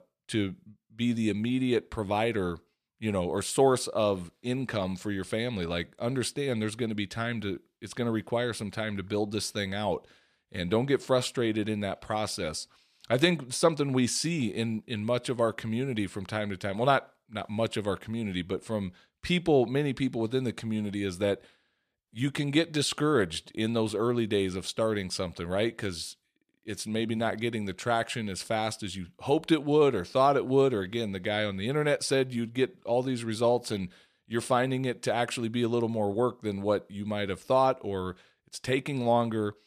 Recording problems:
none

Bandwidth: 14.5 kHz